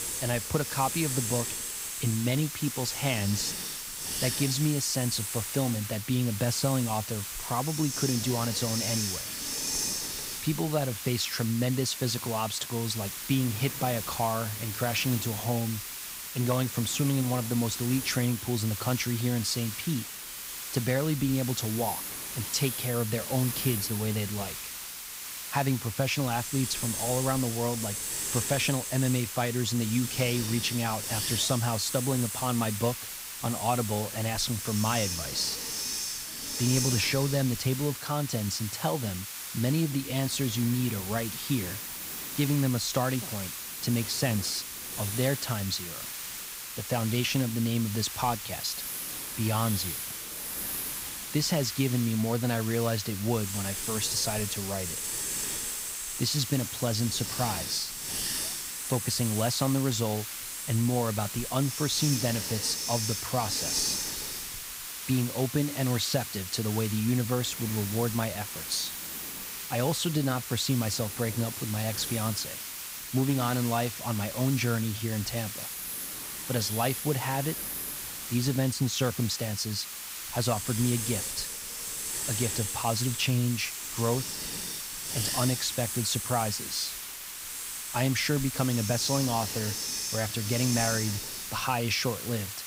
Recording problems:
hiss; loud; throughout; 3 dB below the speech

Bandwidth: 15.5 kHz